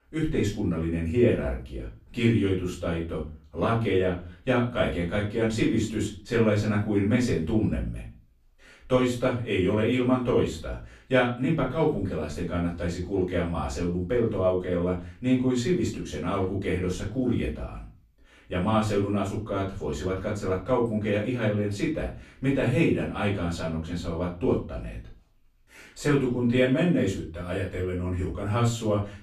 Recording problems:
off-mic speech; far
room echo; slight; dies away in 0.3 s

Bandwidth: 13.5 kHz